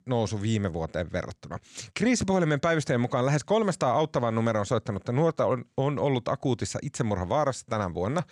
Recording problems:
none

